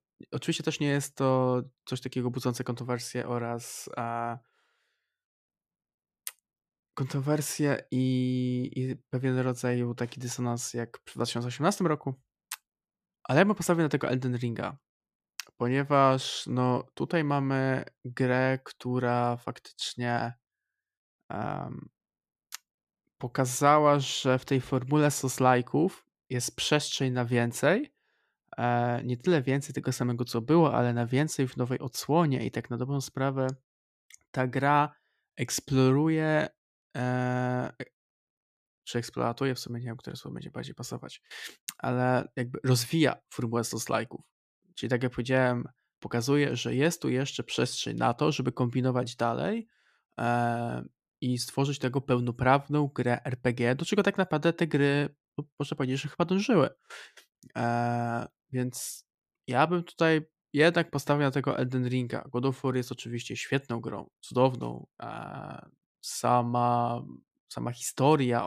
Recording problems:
abrupt cut into speech; at the end

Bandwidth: 14.5 kHz